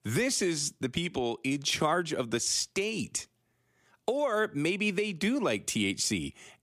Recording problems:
none

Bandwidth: 15 kHz